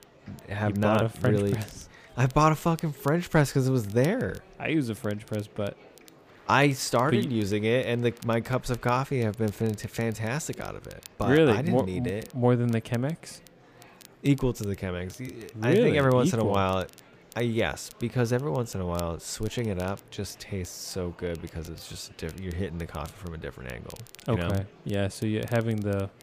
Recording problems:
murmuring crowd; faint; throughout; 25 dB below the speech
crackle, like an old record; faint; 25 dB below the speech

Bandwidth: 15 kHz